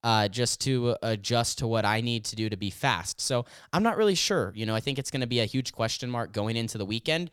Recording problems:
none

